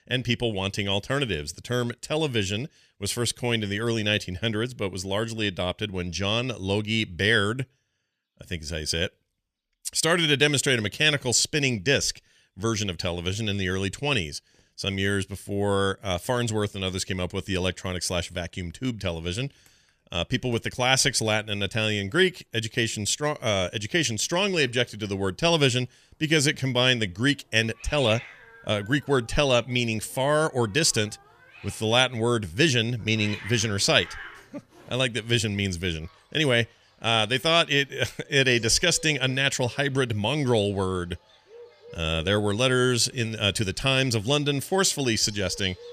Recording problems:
animal sounds; faint; throughout; 20 dB below the speech

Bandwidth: 14.5 kHz